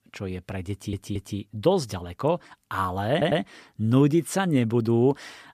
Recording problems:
audio stuttering; at 0.5 s and at 3 s

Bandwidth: 14.5 kHz